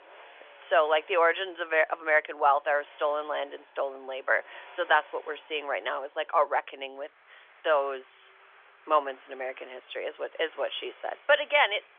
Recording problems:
phone-call audio; nothing above 3.5 kHz
traffic noise; faint; throughout; 25 dB below the speech

